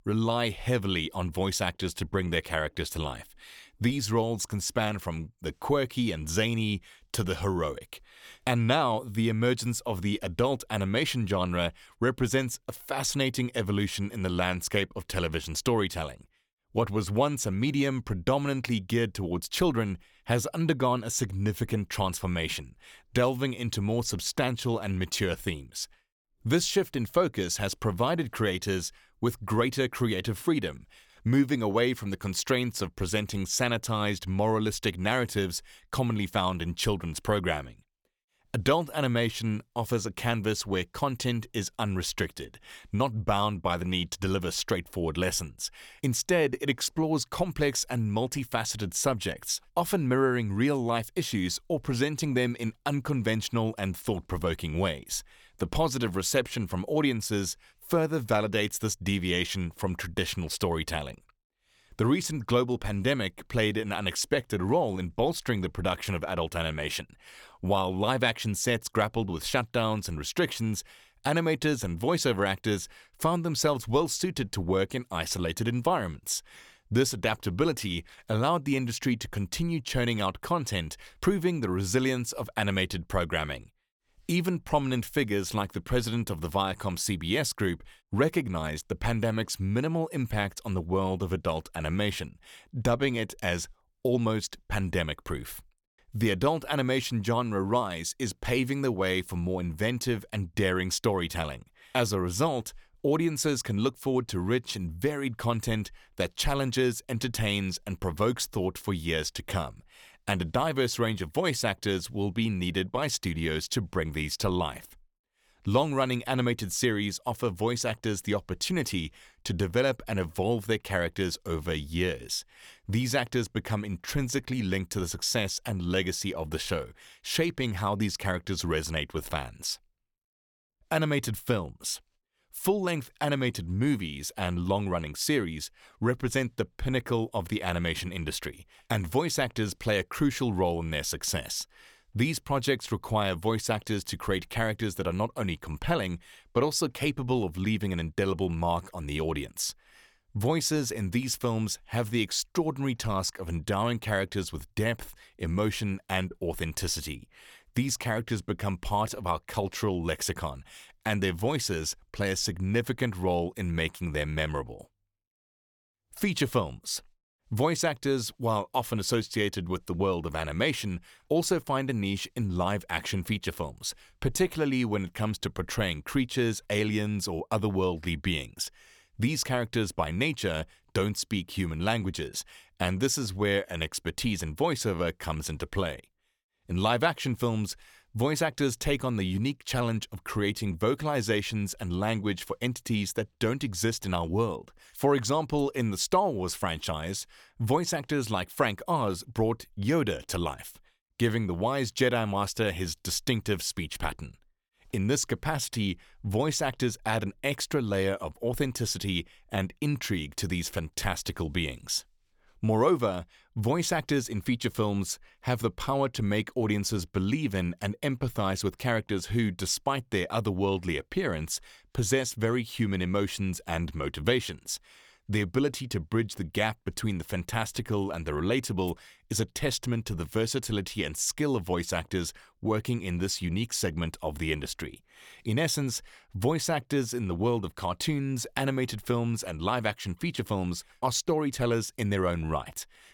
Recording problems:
none

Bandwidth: 19 kHz